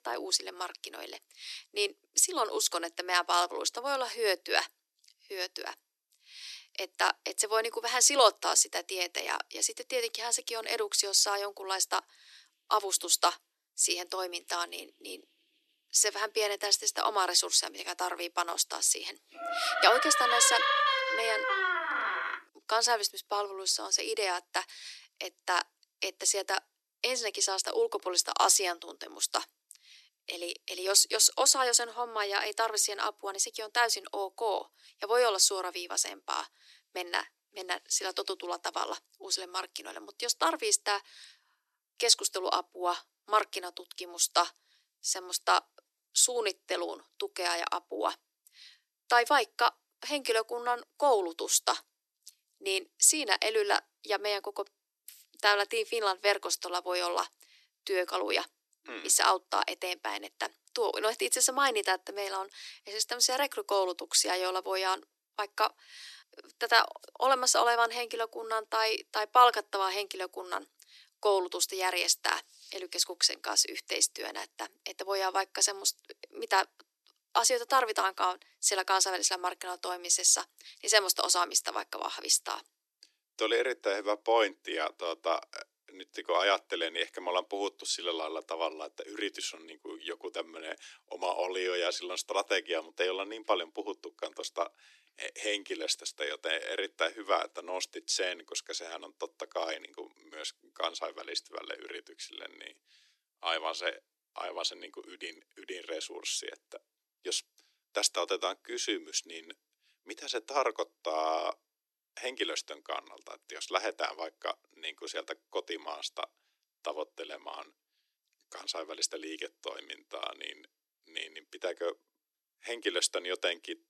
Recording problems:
thin; very; fading below 300 Hz
door banging; loud; from 19 to 22 s; peak 4 dB above the speech

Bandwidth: 13.5 kHz